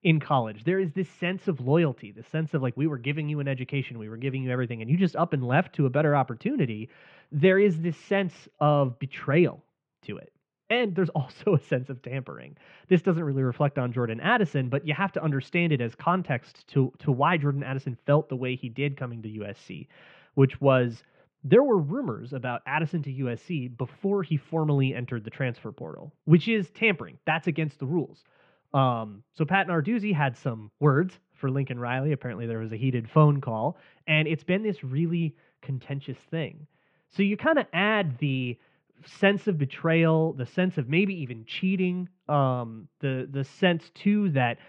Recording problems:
muffled; very; fading above 3 kHz

